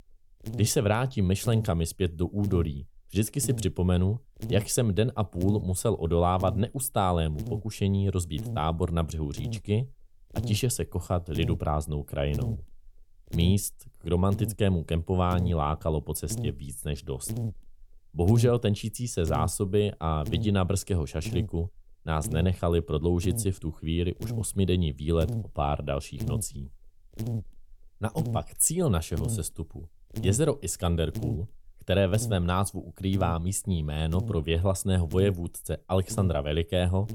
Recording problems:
electrical hum; noticeable; throughout; 50 Hz, 15 dB below the speech

